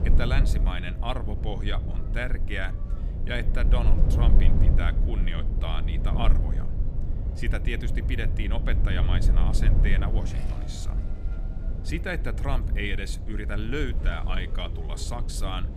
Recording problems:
low rumble; loud; throughout; 8 dB below the speech
household noises; faint; throughout; 20 dB below the speech
traffic noise; faint; throughout; 20 dB below the speech
background music; very faint; throughout; 20 dB below the speech

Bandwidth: 14 kHz